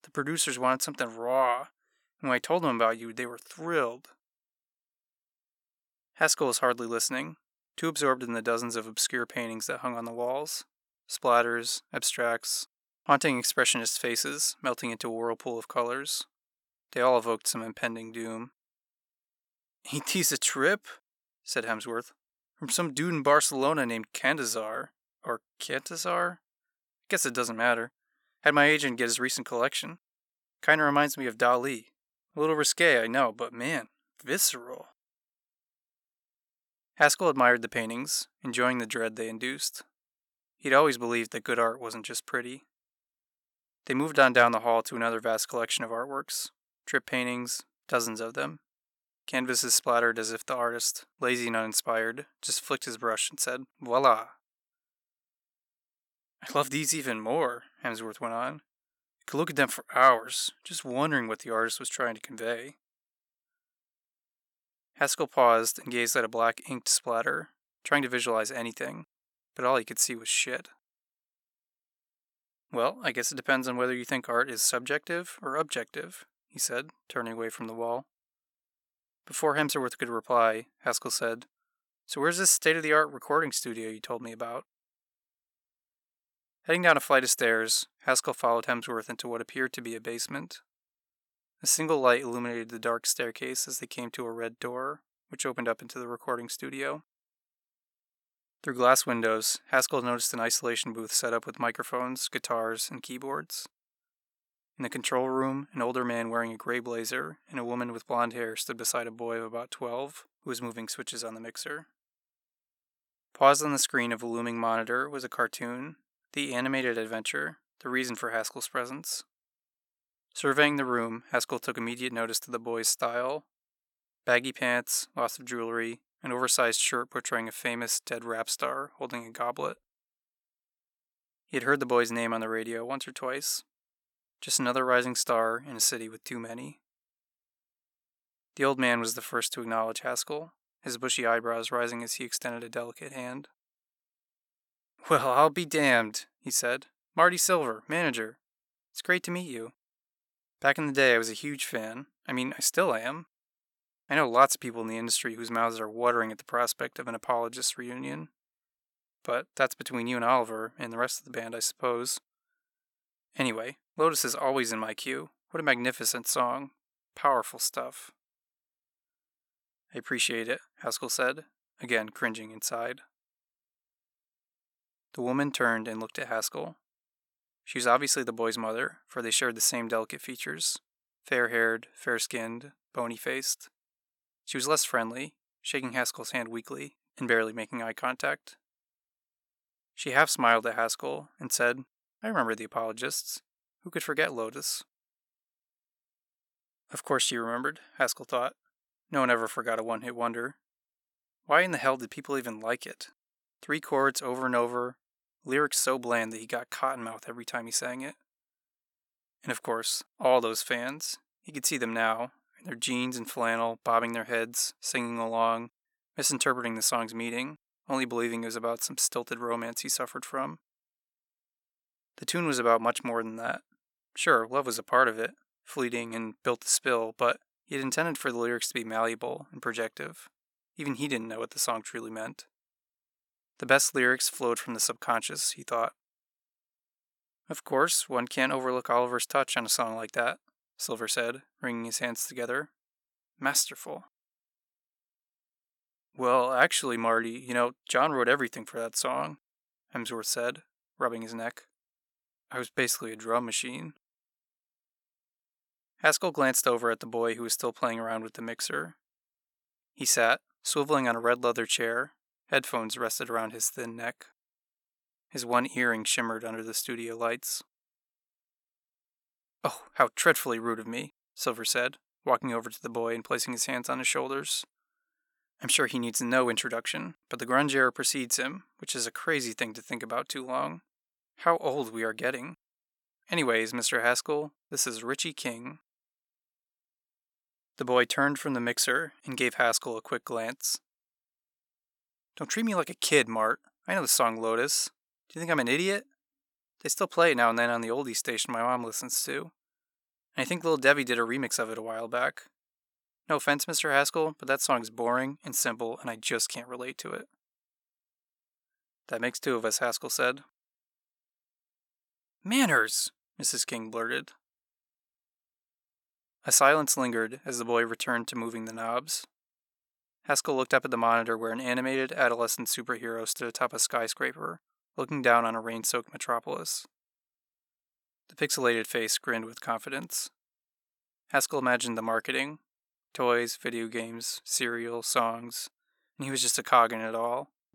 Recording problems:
none

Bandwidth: 17 kHz